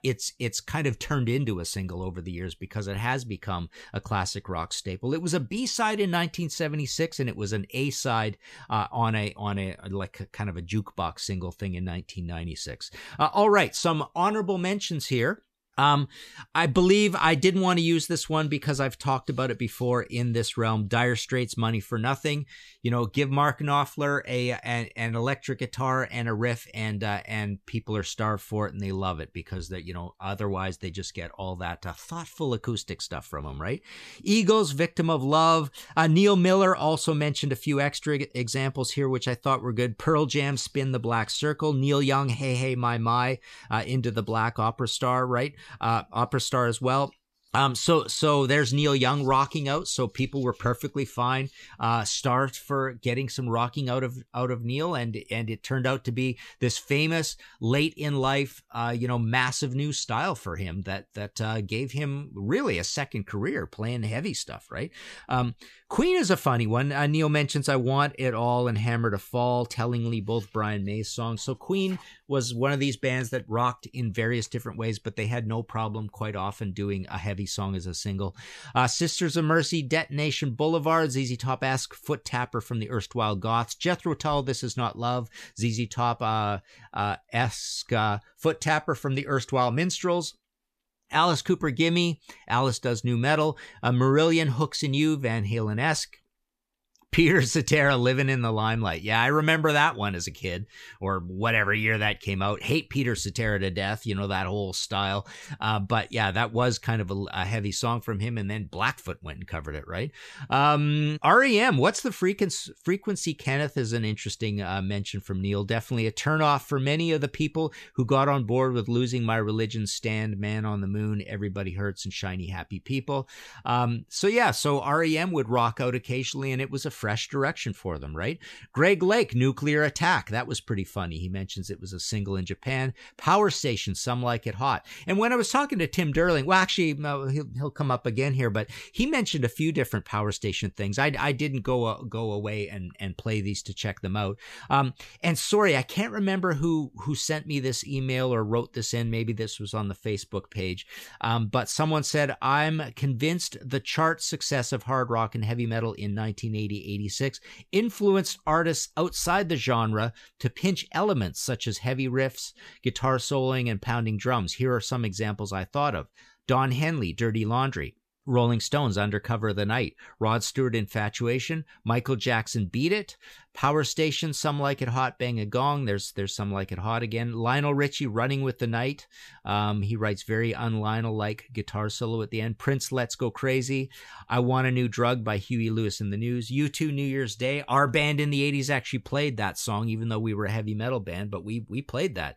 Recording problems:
none

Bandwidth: 14.5 kHz